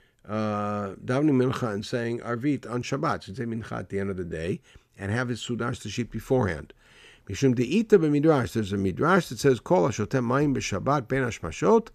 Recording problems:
none

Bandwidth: 14.5 kHz